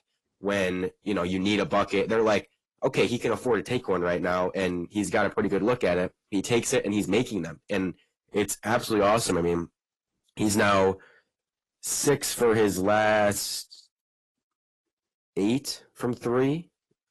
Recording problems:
distortion; slight; 10 dB below the speech
garbled, watery; slightly; nothing above 12.5 kHz

